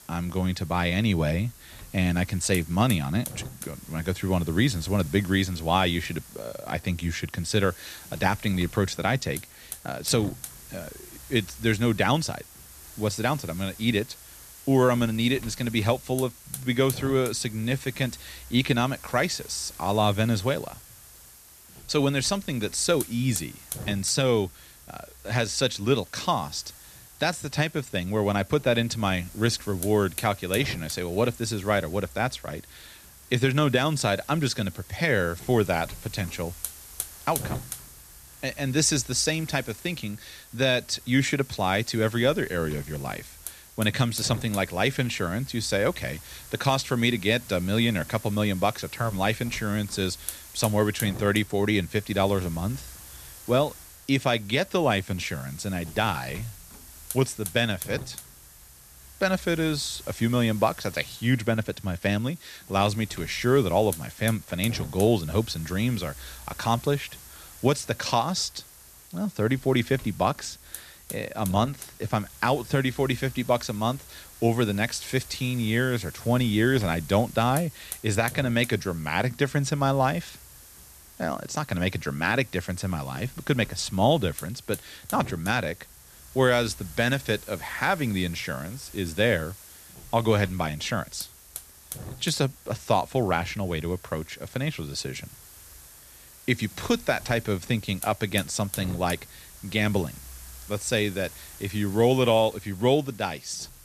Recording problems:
hiss; noticeable; throughout; 15 dB below the speech

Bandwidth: 14 kHz